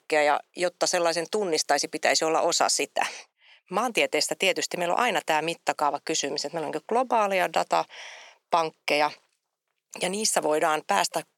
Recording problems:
thin; very; fading below 550 Hz

